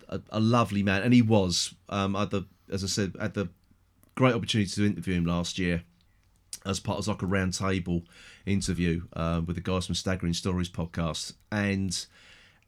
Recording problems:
none

